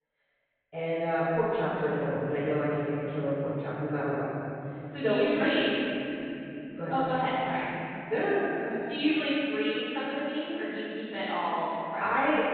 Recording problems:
room echo; strong; dies away in 3 s
off-mic speech; far
high frequencies cut off; severe; nothing above 4 kHz

